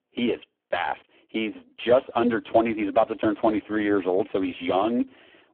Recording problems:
phone-call audio; poor line

